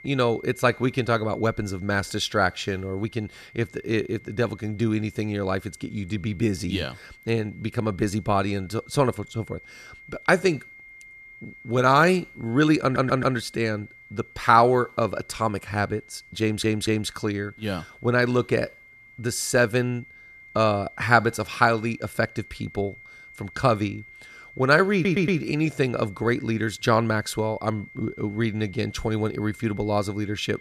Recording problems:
high-pitched whine; faint; throughout; 2 kHz, 20 dB below the speech
audio stuttering; at 13 s, at 16 s and at 25 s

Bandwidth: 13.5 kHz